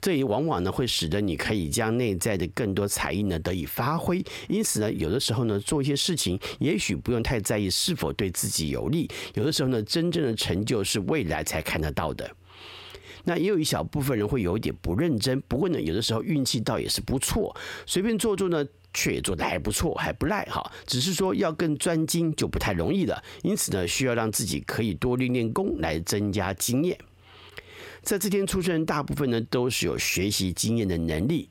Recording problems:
squashed, flat; heavily

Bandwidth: 16.5 kHz